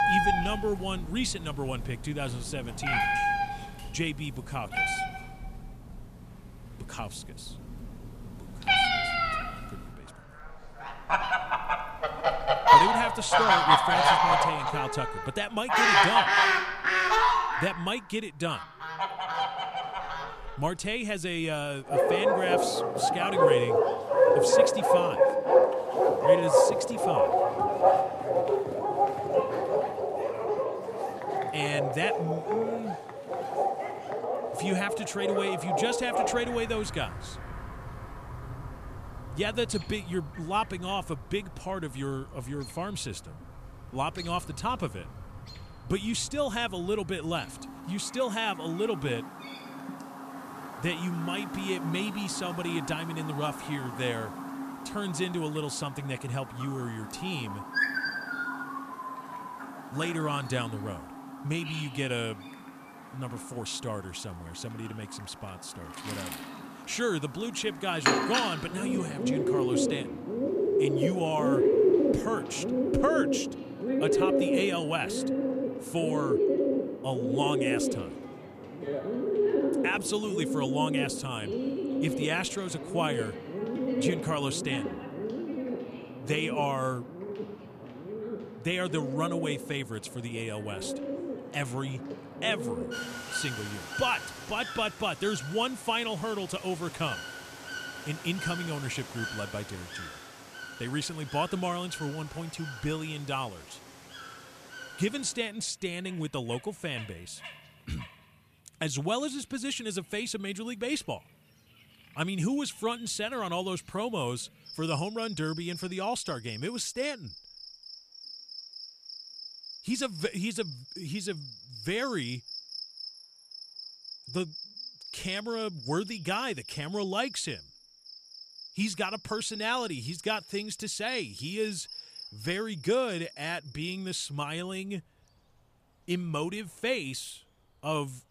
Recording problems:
animal sounds; very loud; throughout; 5 dB above the speech

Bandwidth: 14.5 kHz